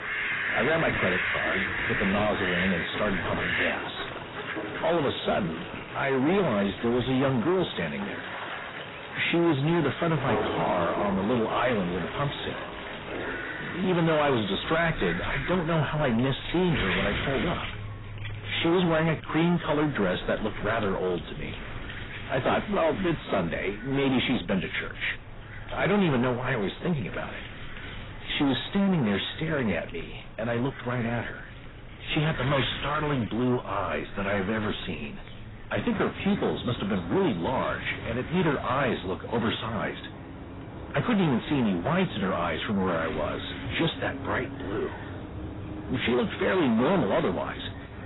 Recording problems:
distortion; heavy; 7 dB below the speech
garbled, watery; badly; nothing above 4 kHz
animal sounds; loud; throughout; 8 dB below the speech
wind noise on the microphone; occasional gusts; 10 dB below the speech

